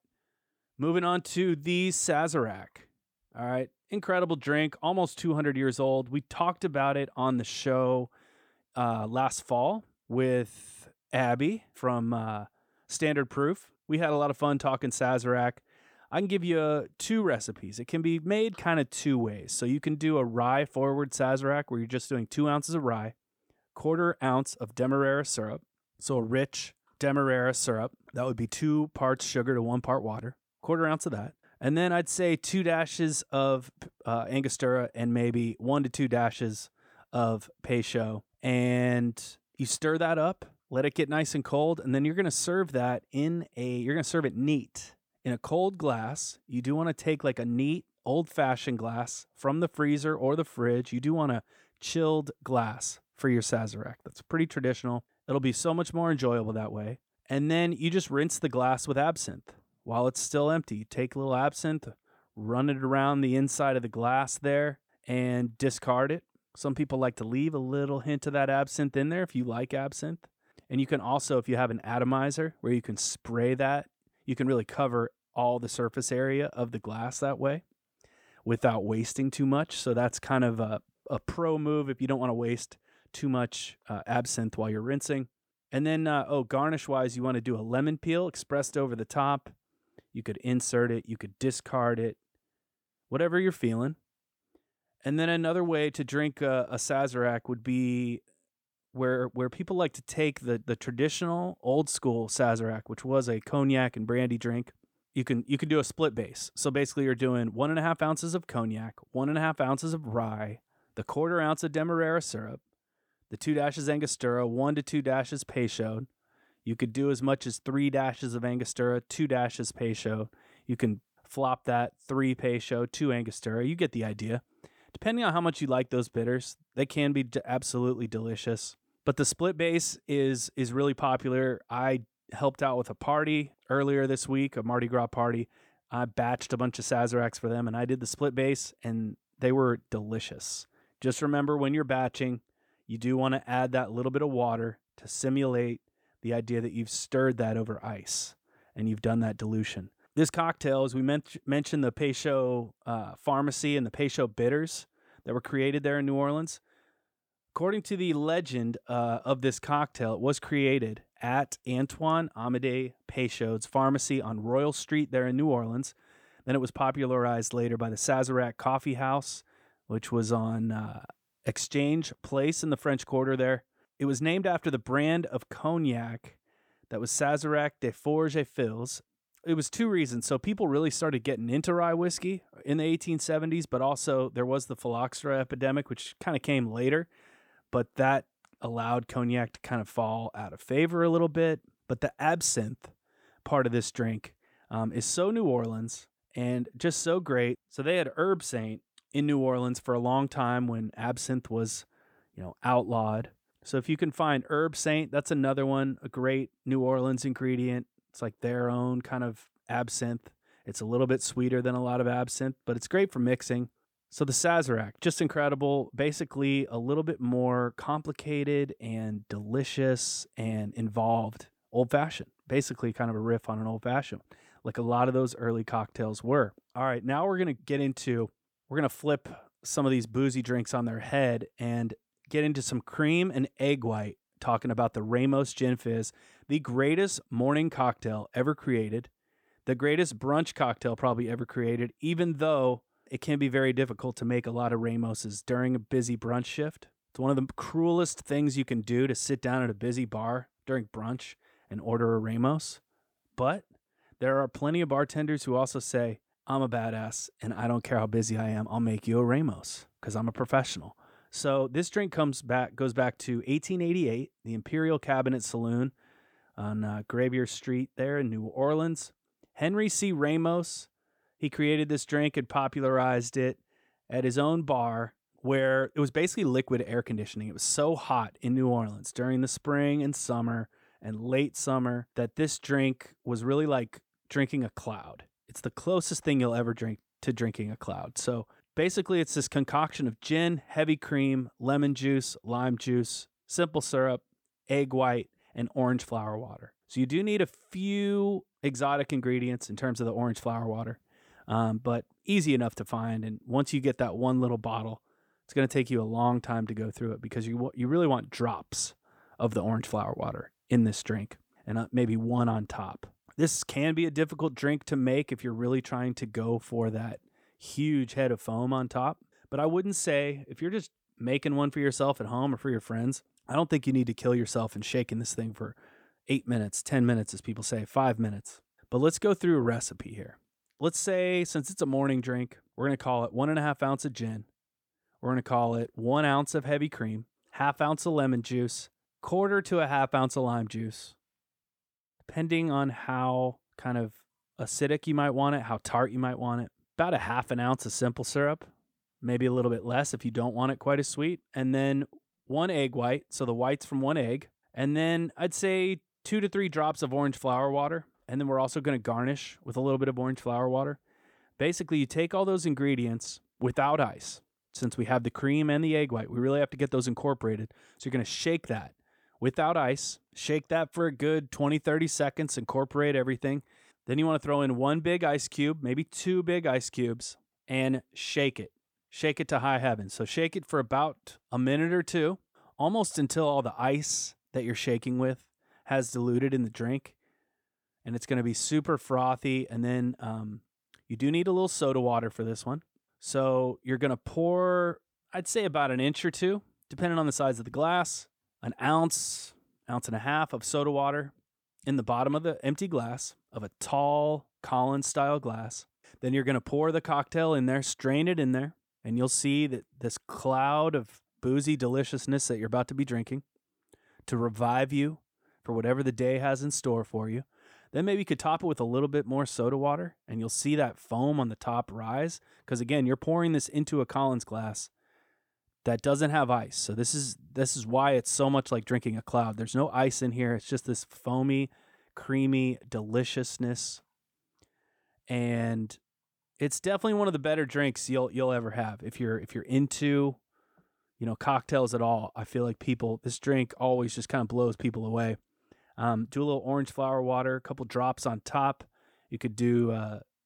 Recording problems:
none

